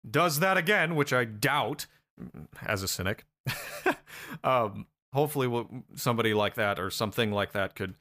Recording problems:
none

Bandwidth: 15 kHz